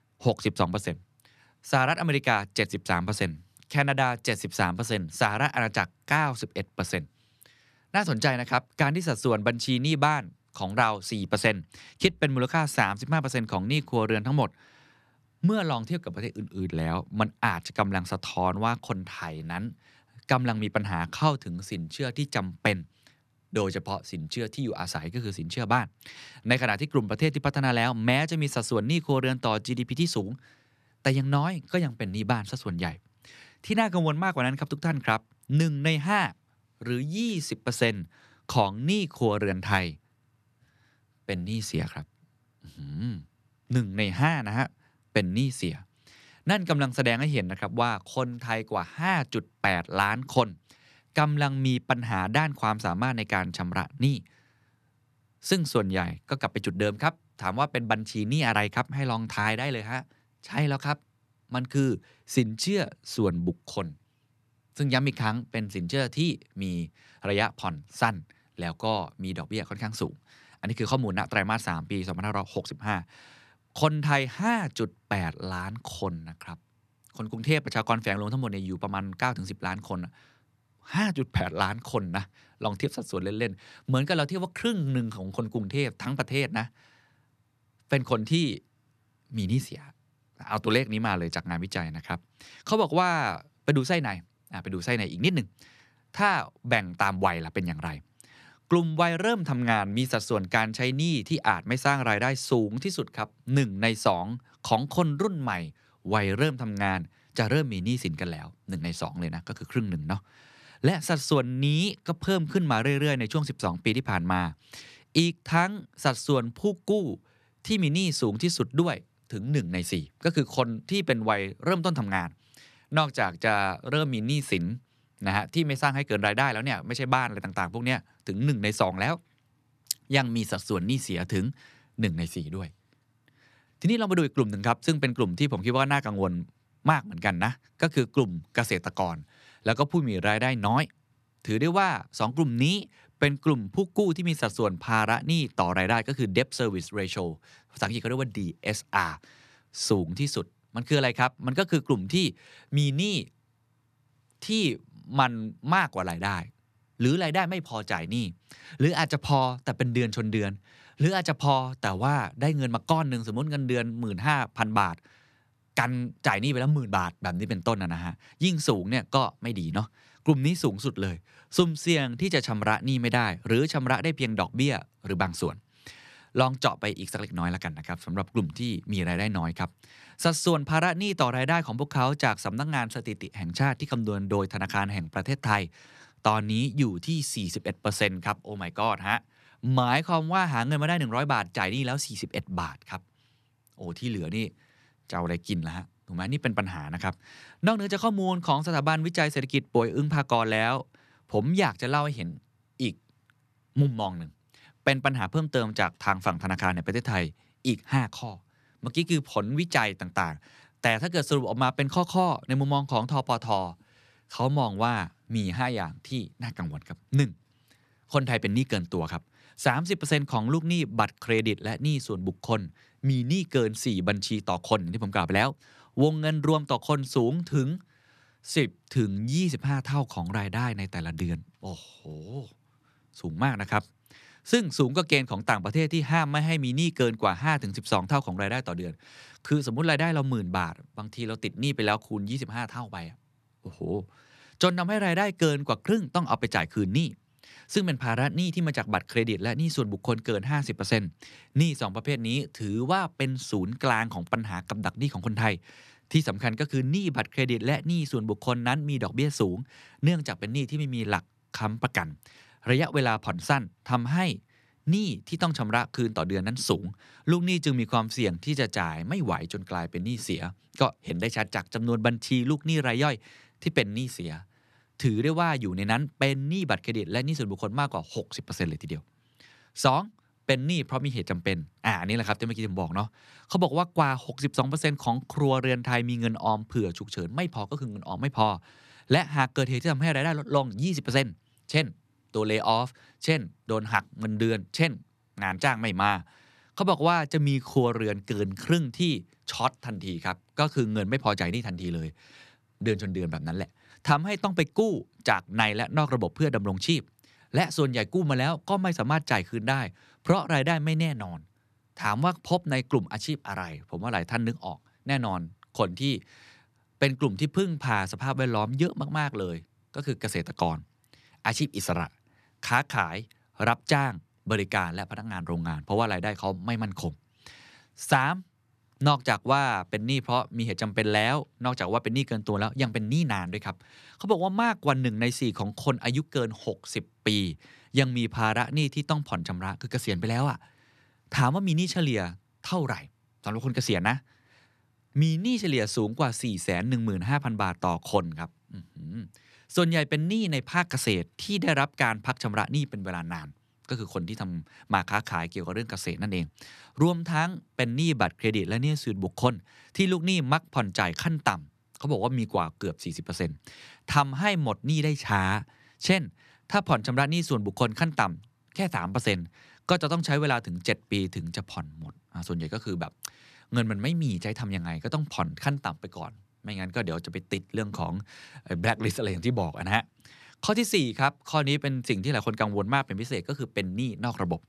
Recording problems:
none

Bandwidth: 13.5 kHz